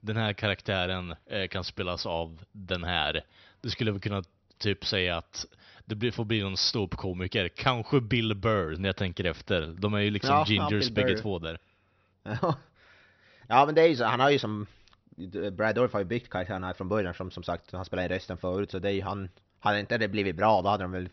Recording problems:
high frequencies cut off; noticeable; nothing above 6 kHz

